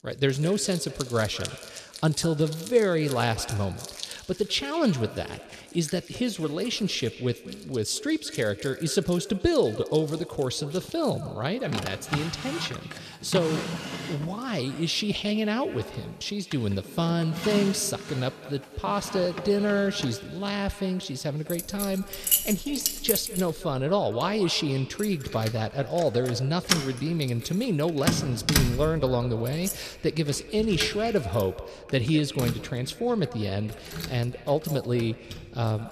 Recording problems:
echo of what is said; noticeable; throughout; 200 ms later, 15 dB below the speech
household noises; loud; throughout; 5 dB below the speech

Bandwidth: 14 kHz